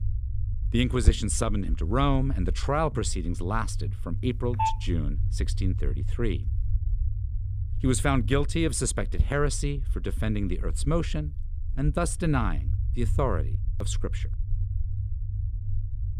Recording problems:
low rumble; noticeable; throughout; 20 dB below the speech
phone ringing; loud; at 4.5 s; peak level with the speech

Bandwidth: 15 kHz